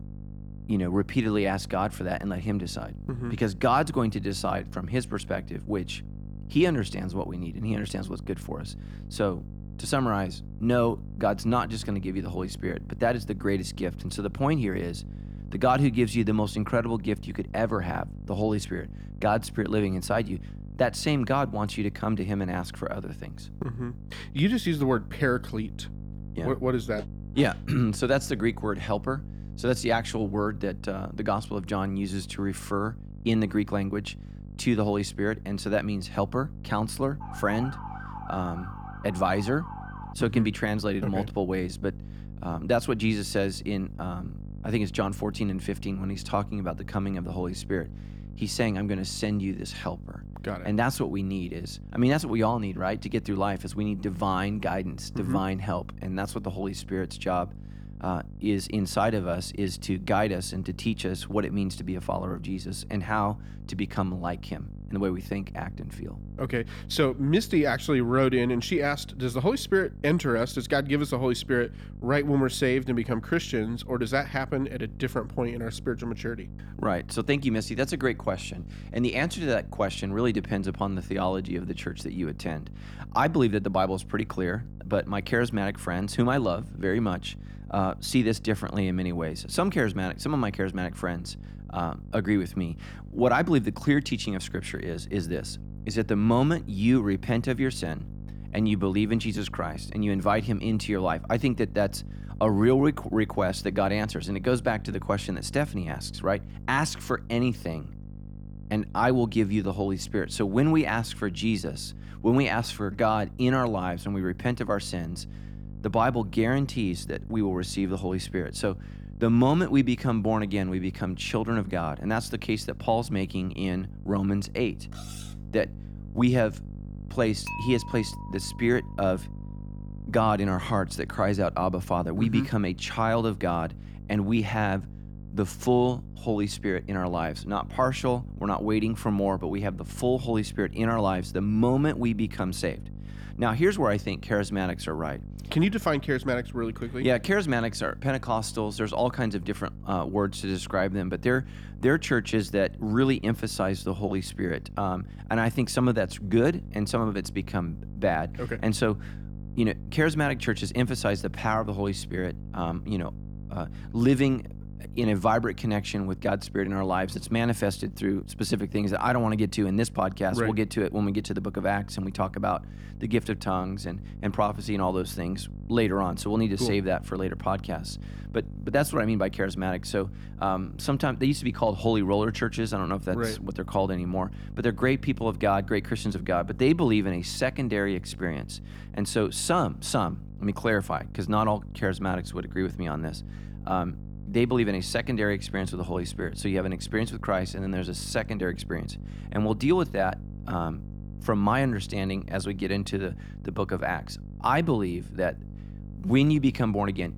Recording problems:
electrical hum; faint; throughout; 50 Hz, 20 dB below the speech
siren; faint; from 37 to 40 s; peak 10 dB below the speech
clattering dishes; faint; at 2:05; peak 15 dB below the speech
clattering dishes; noticeable; from 2:07 to 2:09; peak 8 dB below the speech

